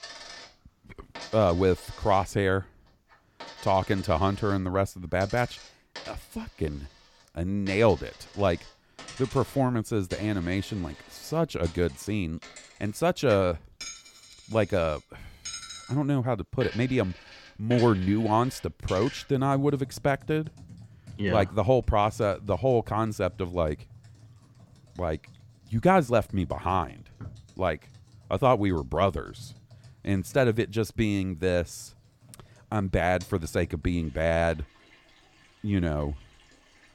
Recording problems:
household noises; noticeable; throughout; 20 dB below the speech

